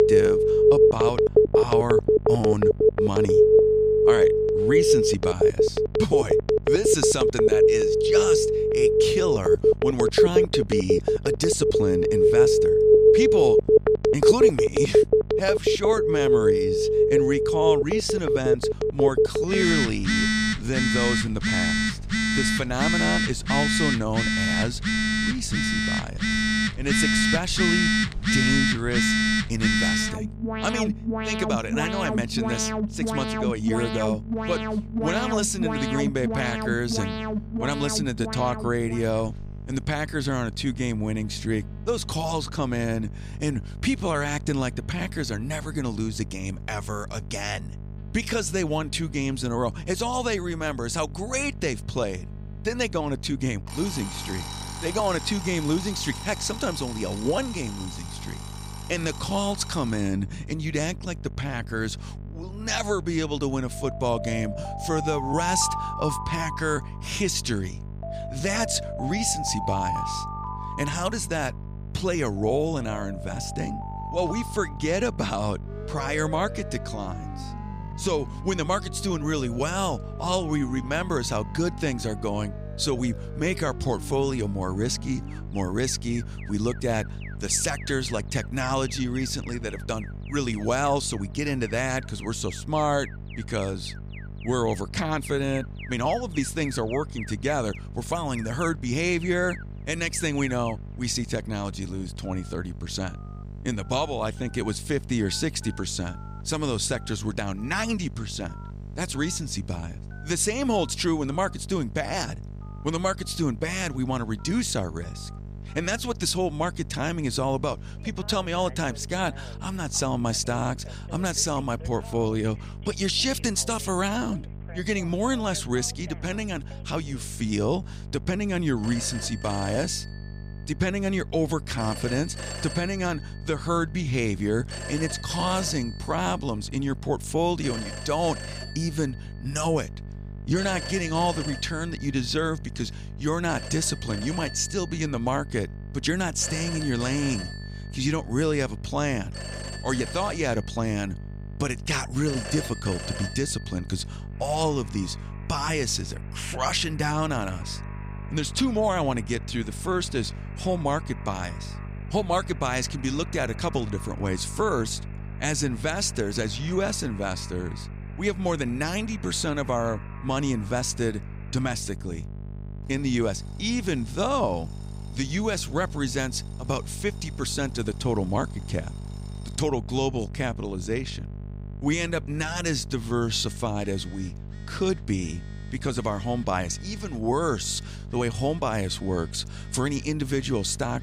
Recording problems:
alarms or sirens; very loud; throughout; 5 dB above the speech
electrical hum; faint; throughout; 50 Hz, 20 dB below the speech

